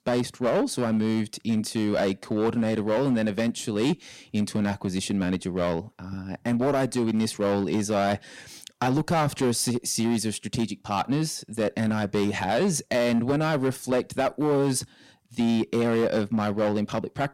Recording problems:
distortion; slight; 9% of the sound clipped

